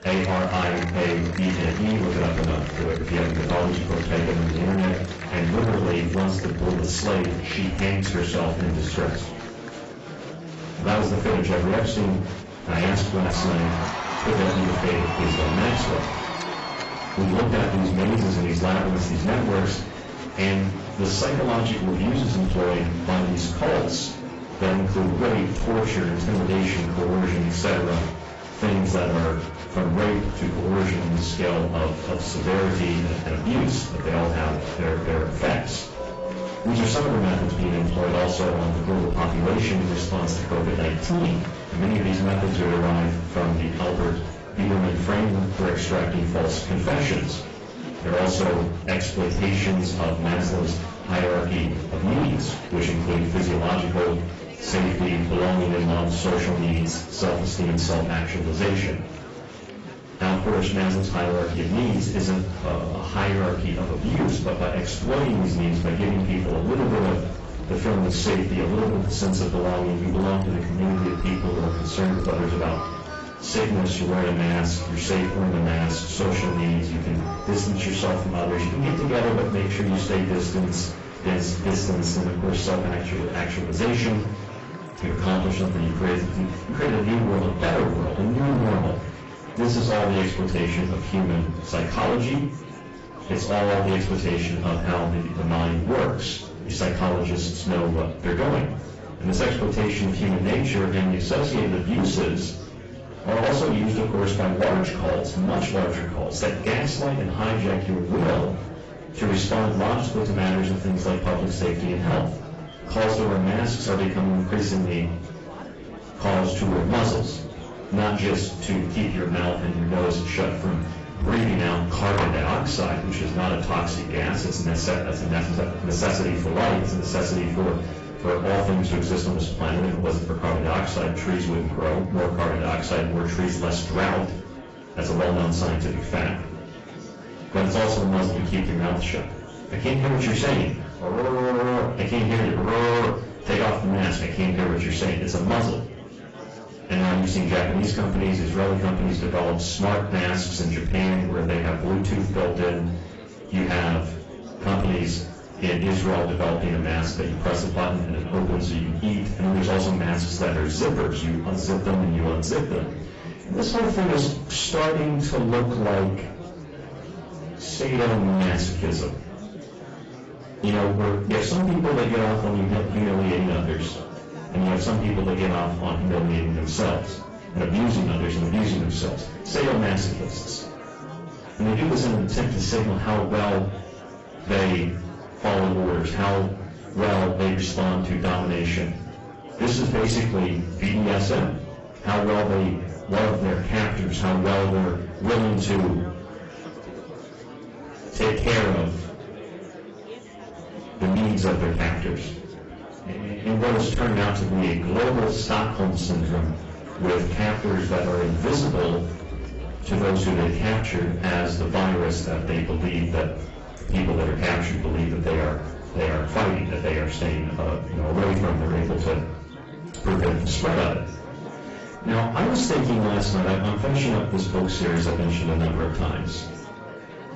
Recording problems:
distortion; heavy; 21% of the sound clipped
off-mic speech; far
garbled, watery; badly; nothing above 7.5 kHz
room echo; slight; dies away in 0.4 s
murmuring crowd; noticeable; throughout; 15 dB below the speech
background music; faint; throughout; 20 dB below the speech
clattering dishes; noticeable; at 2:02; peak 4 dB below the speech

